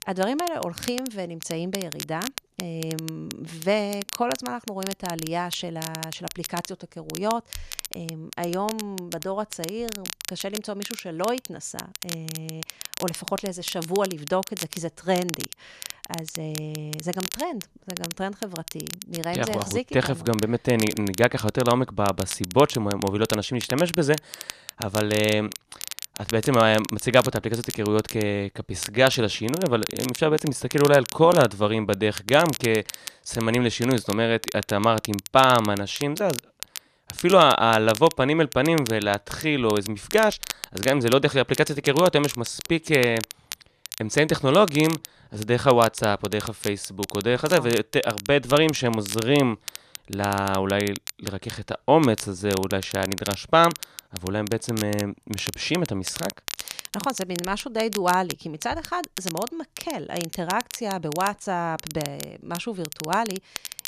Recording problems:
crackle, like an old record; noticeable; 10 dB below the speech

